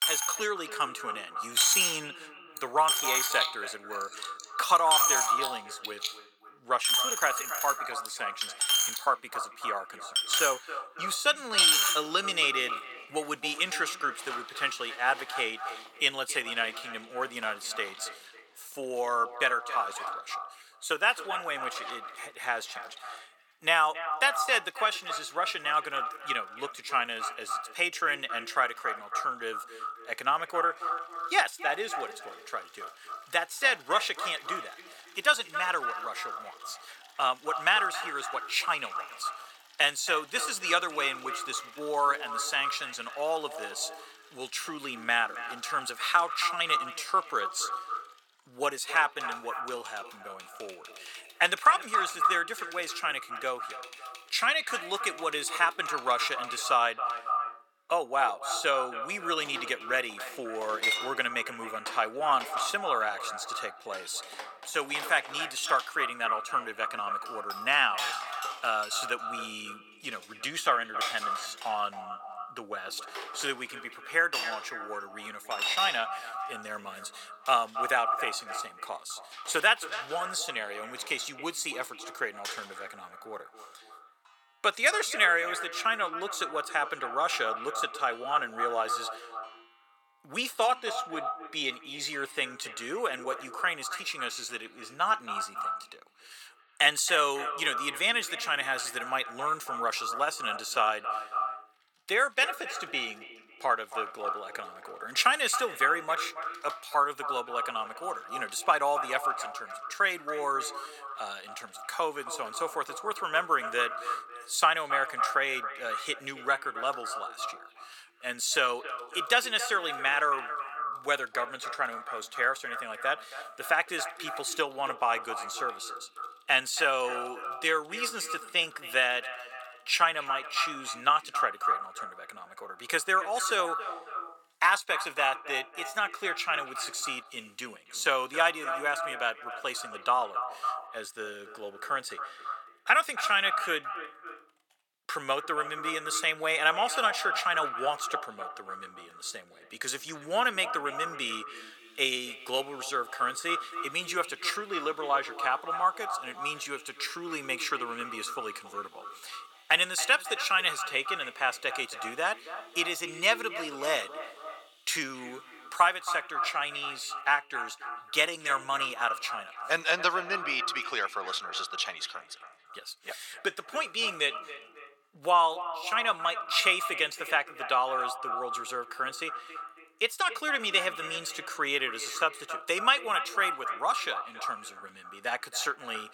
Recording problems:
echo of what is said; strong; throughout; 270 ms later, 8 dB below the speech
thin; very; fading below 800 Hz
household noises; loud; throughout; 3 dB below the speech

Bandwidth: 18 kHz